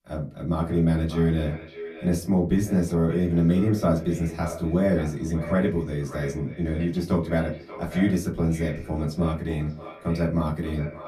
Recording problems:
off-mic speech; far
echo of what is said; noticeable; throughout; 580 ms later, 15 dB below the speech
room echo; very slight; dies away in 0.2 s

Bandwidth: 14.5 kHz